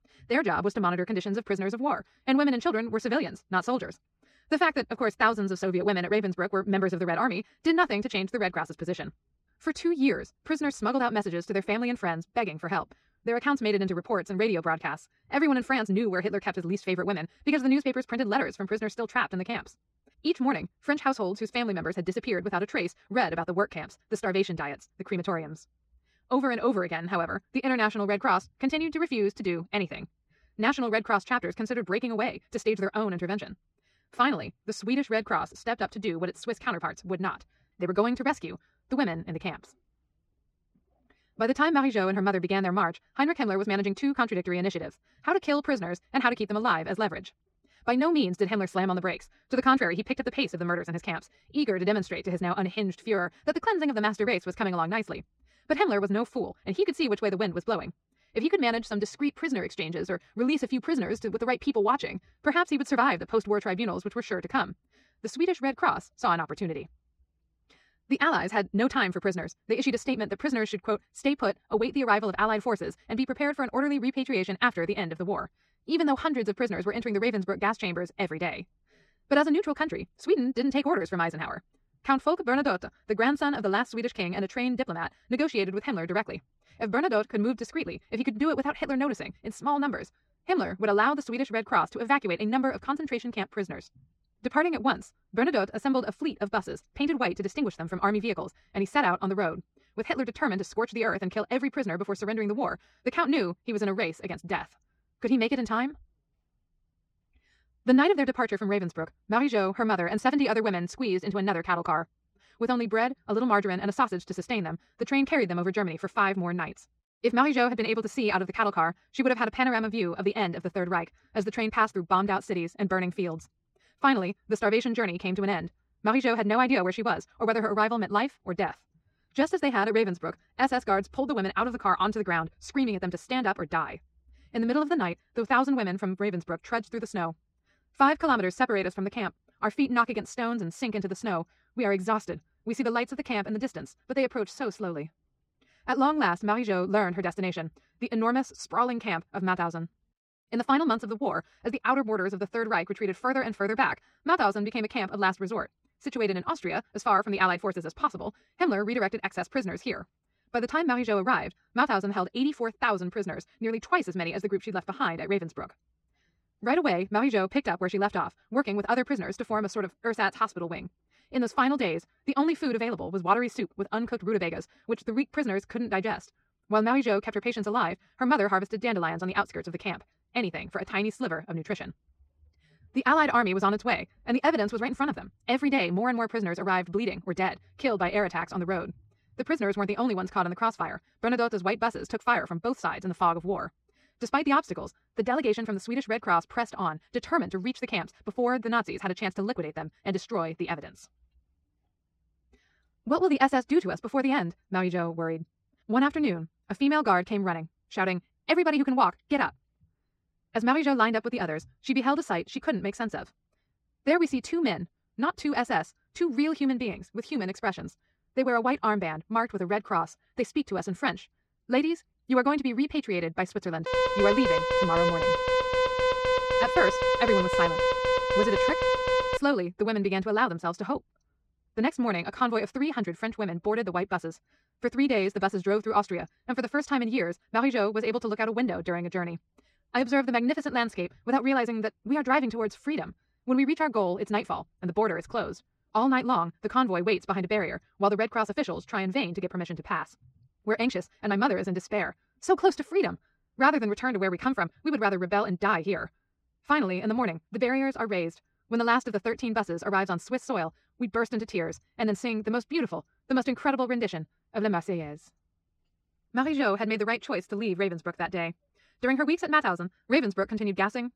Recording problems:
wrong speed, natural pitch; too fast; 1.7 times normal speed
muffled; slightly; fading above 3 kHz
alarm; loud; from 3:44 to 3:49; peak 4 dB above the speech

